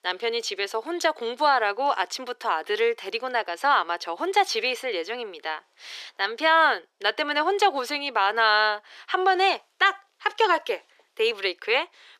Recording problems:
thin; very; fading below 400 Hz

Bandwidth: 14 kHz